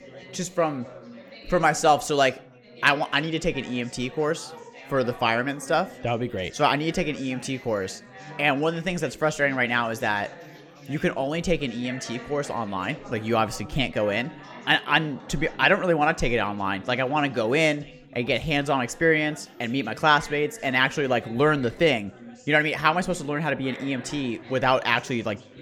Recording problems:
chatter from many people; noticeable; throughout; 20 dB below the speech

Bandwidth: 17.5 kHz